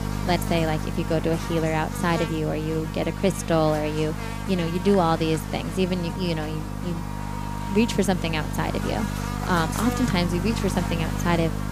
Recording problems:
electrical hum; loud; throughout; 50 Hz, 7 dB below the speech

